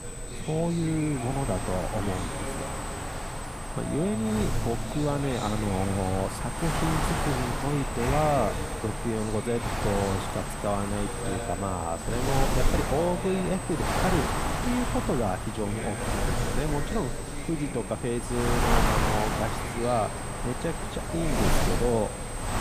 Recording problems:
wind noise on the microphone; heavy; 1 dB below the speech
background chatter; loud; throughout; 2 voices, 9 dB below the speech
high-pitched whine; noticeable; throughout; 8 kHz, 10 dB below the speech

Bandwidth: 15 kHz